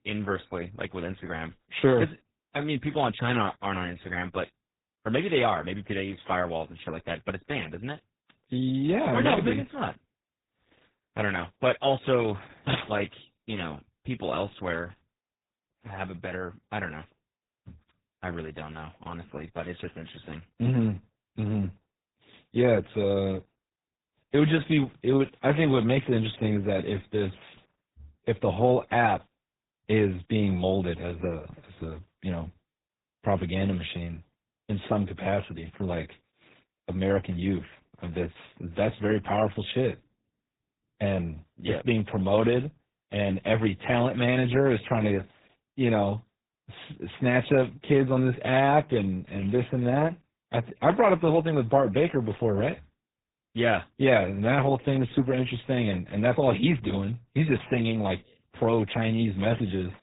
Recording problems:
garbled, watery; badly; nothing above 4 kHz
high frequencies cut off; slight

